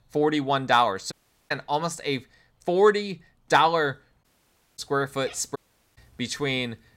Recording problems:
animal sounds; faint; throughout; 30 dB below the speech
audio cutting out; at 1 s, at 4 s for 0.5 s and at 5.5 s

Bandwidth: 16 kHz